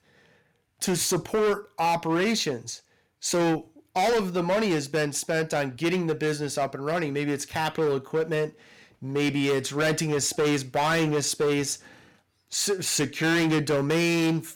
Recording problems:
distortion; heavy; 14% of the sound clipped

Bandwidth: 17 kHz